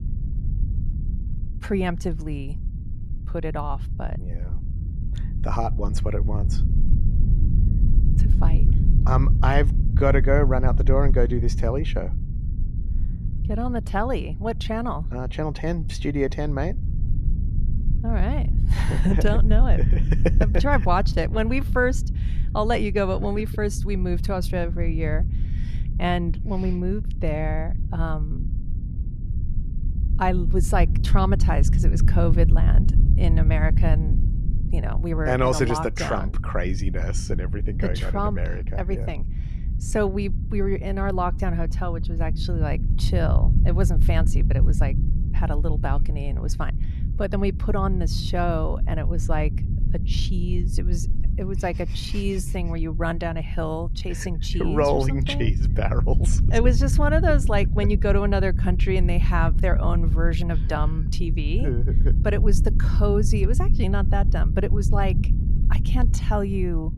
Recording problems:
low rumble; noticeable; throughout; 10 dB below the speech

